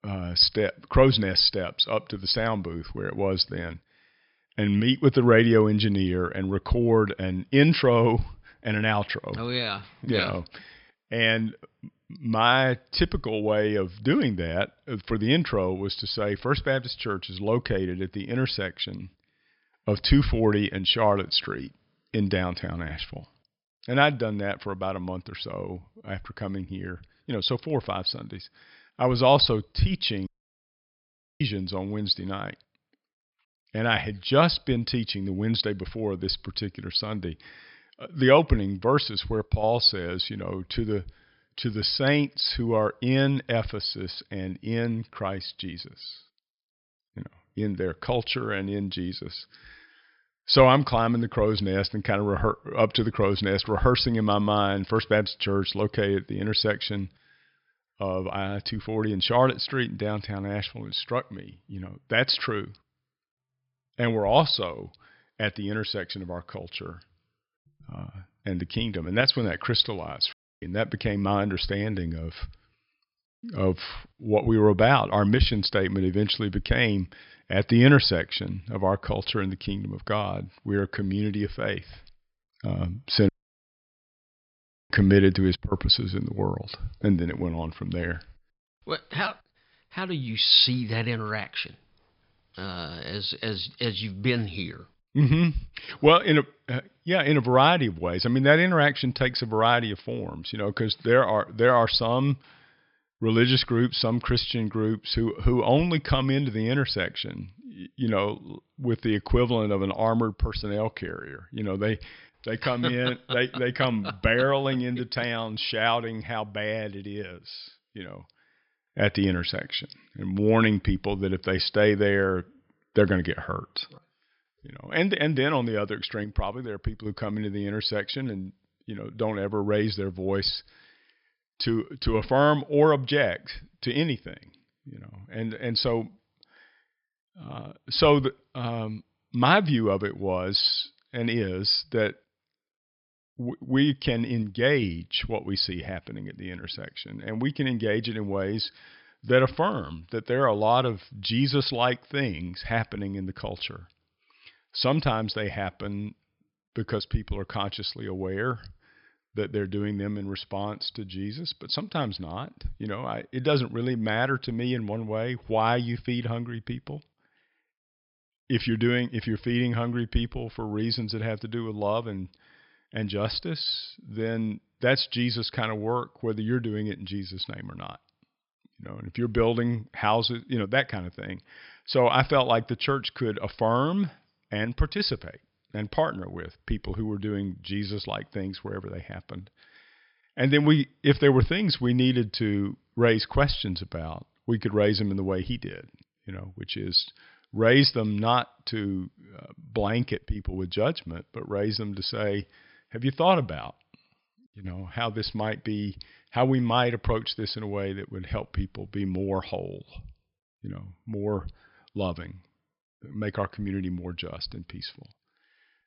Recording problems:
high frequencies cut off; noticeable; nothing above 5.5 kHz
audio cutting out; at 30 s for 1 s, at 1:10 and at 1:23 for 1.5 s

